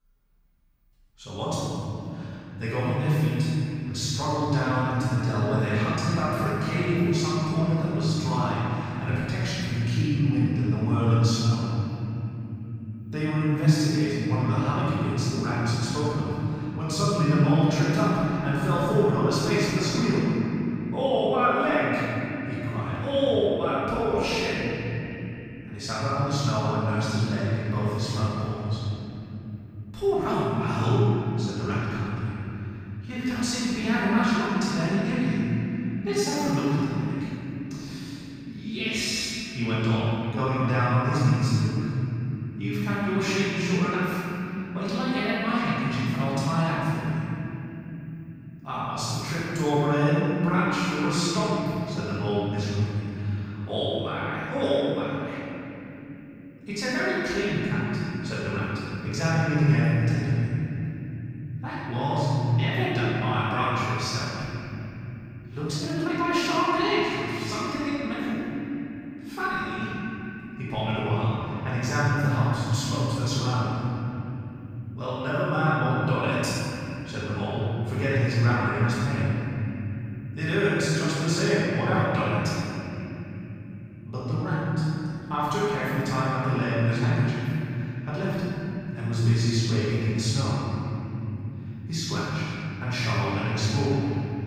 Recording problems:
room echo; strong; dies away in 3 s
off-mic speech; far
uneven, jittery; strongly; from 33 s to 1:06

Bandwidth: 15.5 kHz